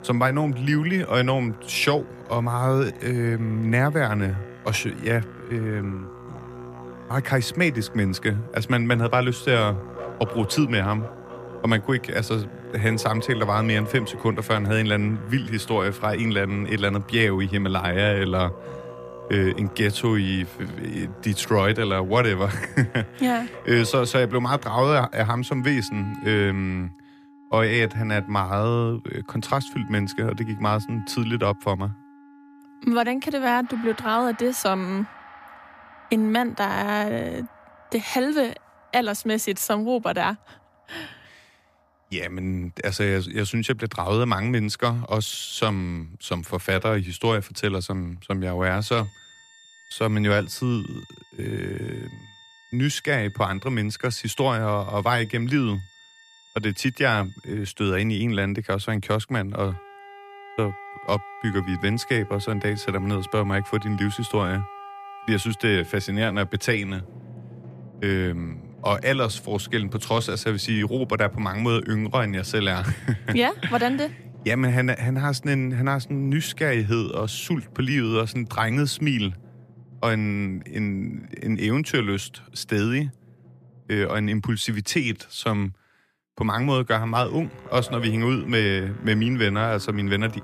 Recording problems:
background music; noticeable; throughout; 20 dB below the speech

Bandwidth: 14.5 kHz